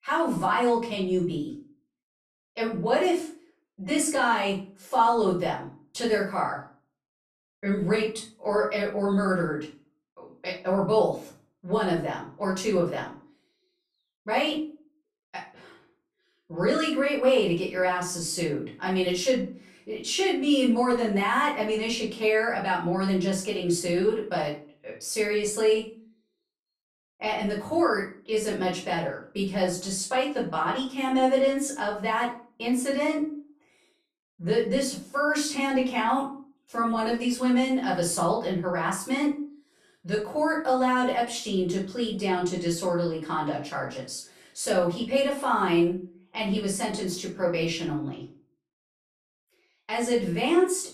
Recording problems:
off-mic speech; far
room echo; slight; dies away in 0.3 s

